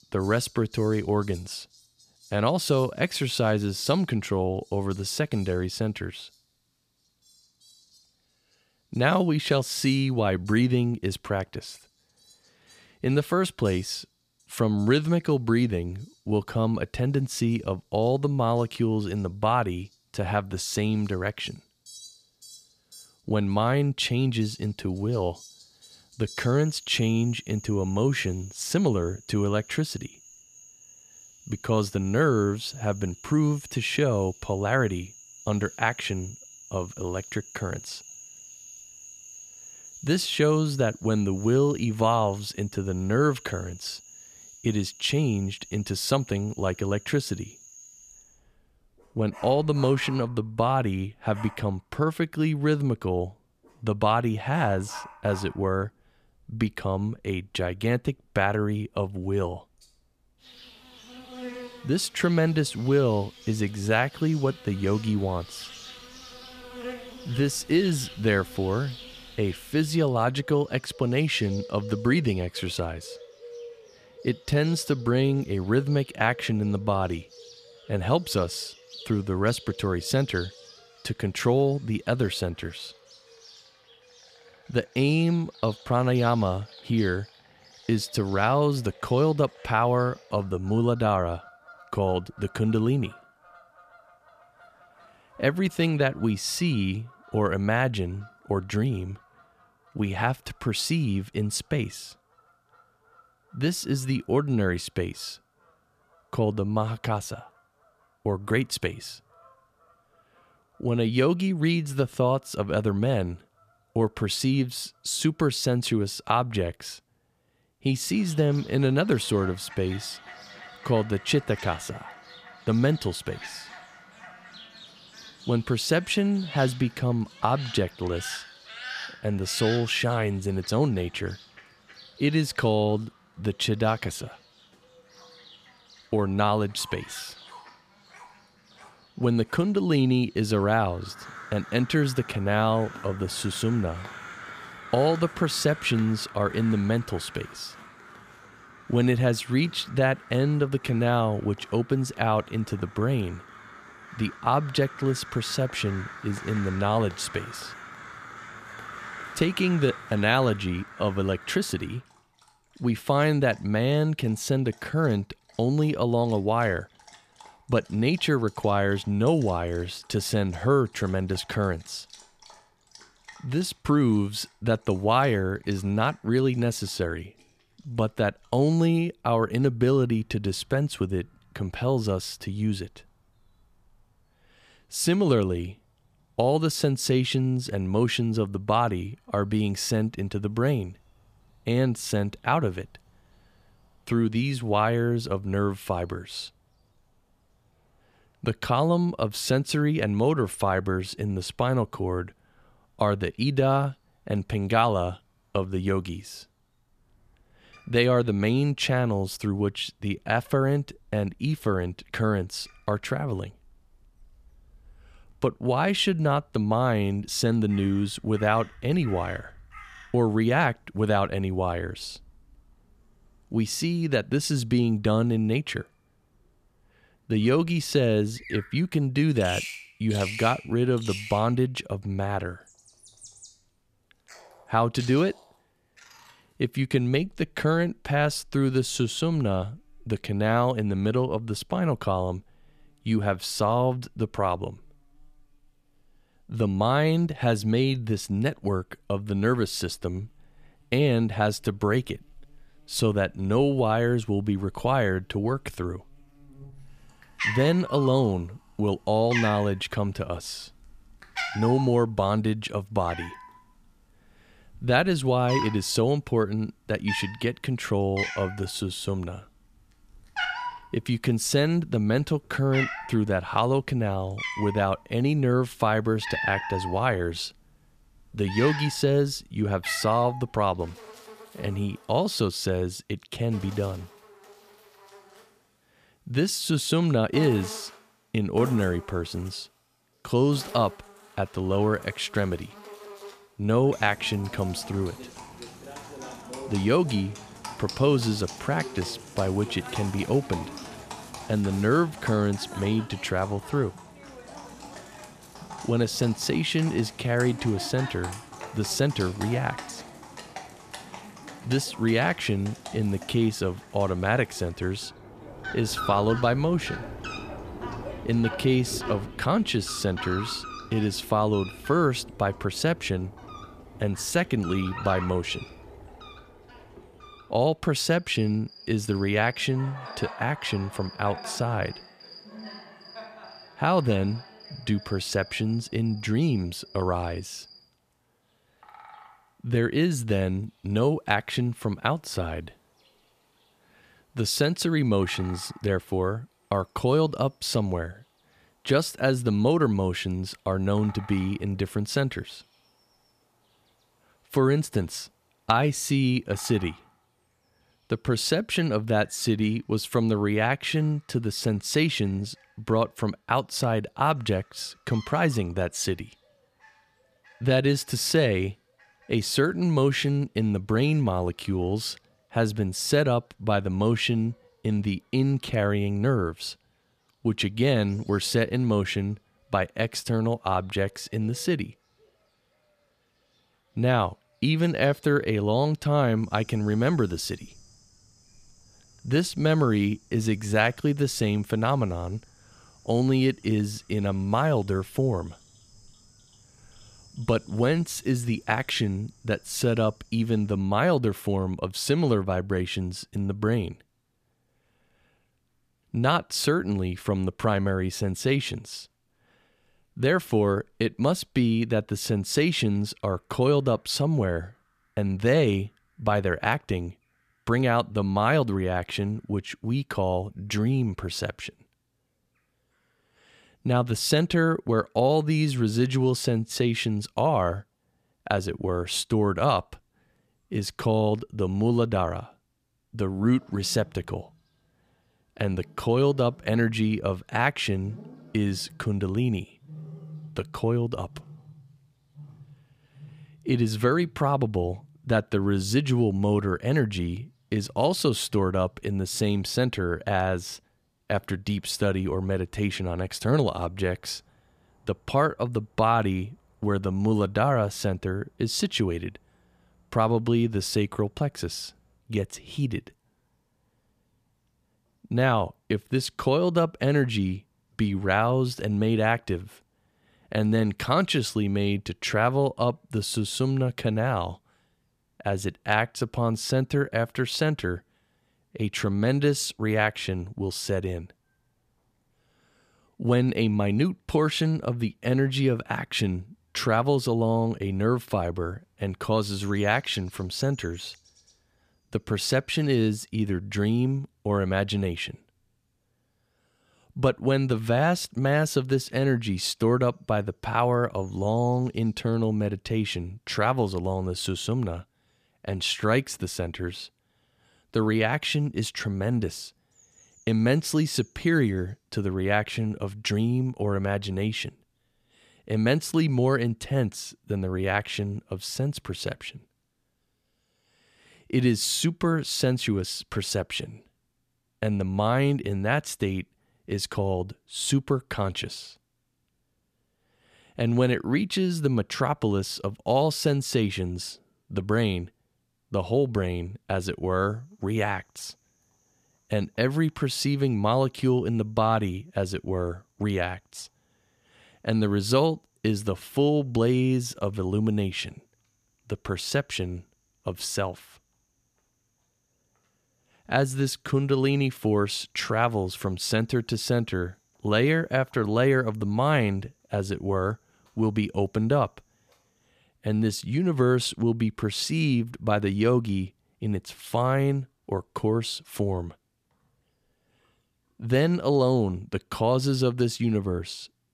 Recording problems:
animal sounds; noticeable; throughout; 15 dB below the speech

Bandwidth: 14.5 kHz